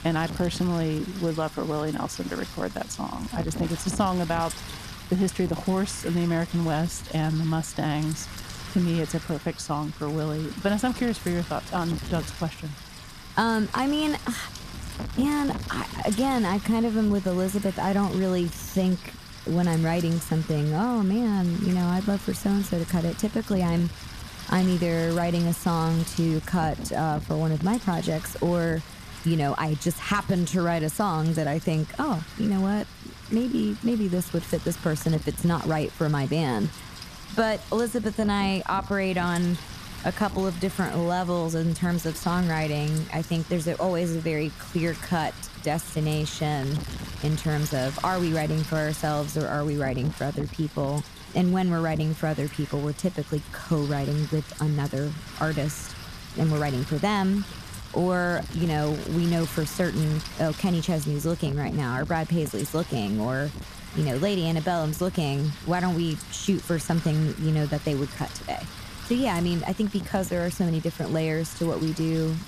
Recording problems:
wind noise on the microphone; occasional gusts; 10 dB below the speech

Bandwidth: 14.5 kHz